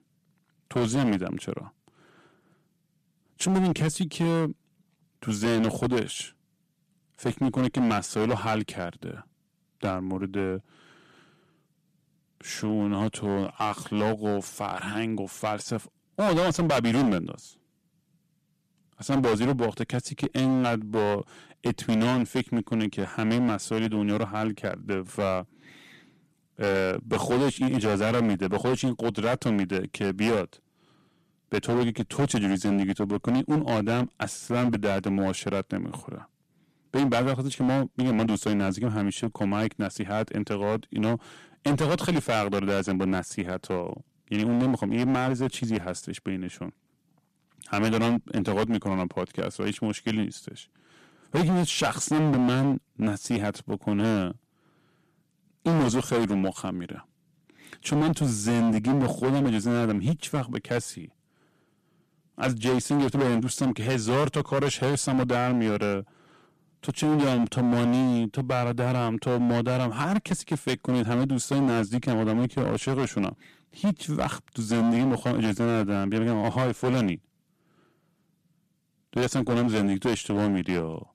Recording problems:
distortion; heavy; 12% of the sound clipped

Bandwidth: 14.5 kHz